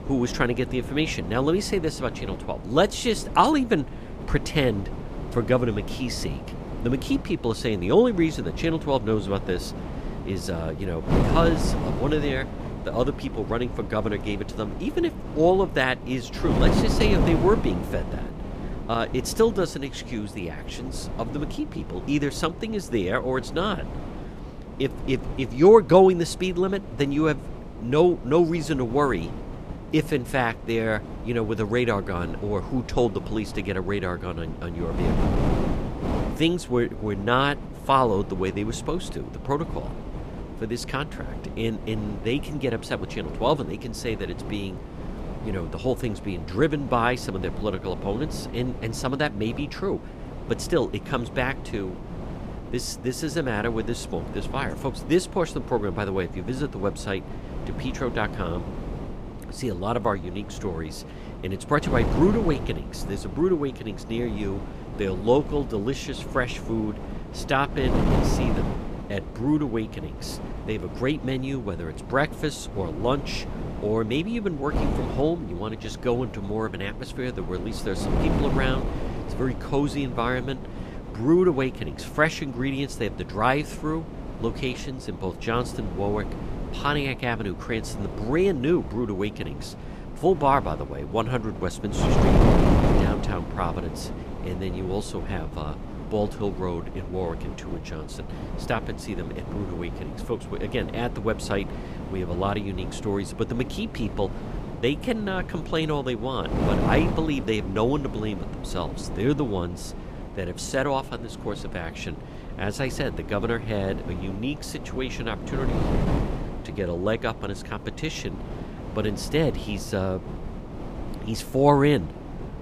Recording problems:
wind noise on the microphone; heavy; 9 dB below the speech

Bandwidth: 14.5 kHz